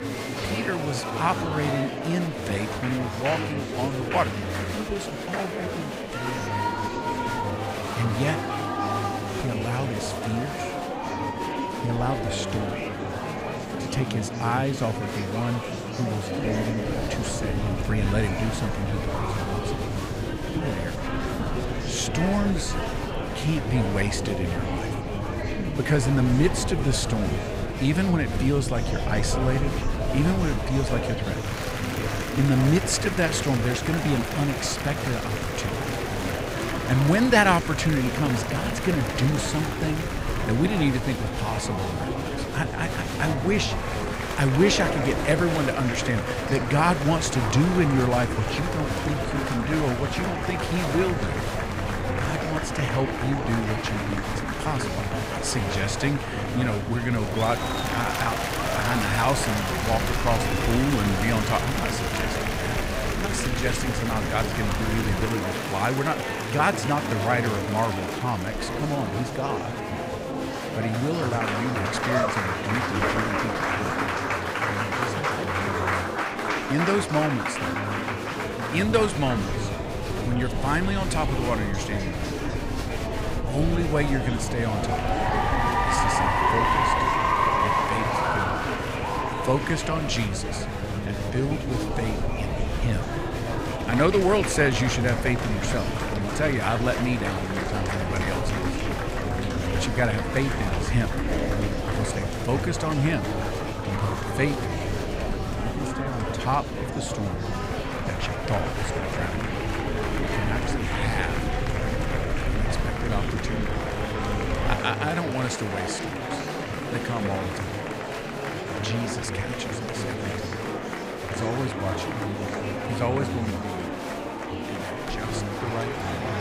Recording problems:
murmuring crowd; loud; throughout; 1 dB below the speech
low rumble; noticeable; from 17 s to 1:05 and from 1:19 to 1:55; 20 dB below the speech

